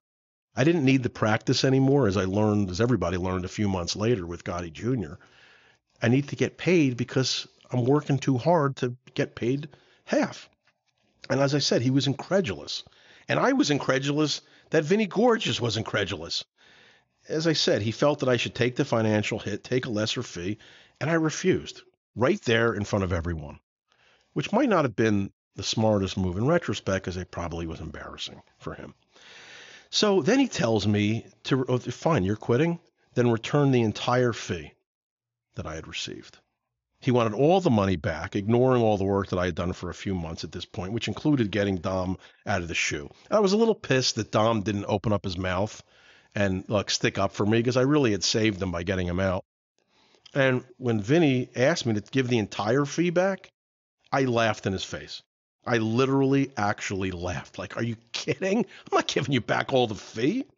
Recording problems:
high frequencies cut off; noticeable; nothing above 7 kHz

